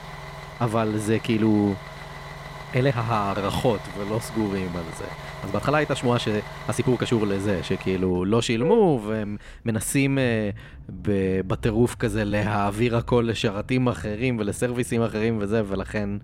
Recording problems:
traffic noise; noticeable; throughout; 15 dB below the speech
uneven, jittery; strongly; from 0.5 to 15 s

